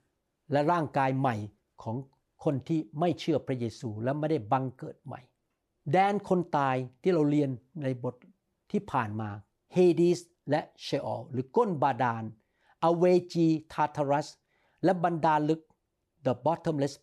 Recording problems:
none

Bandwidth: 14 kHz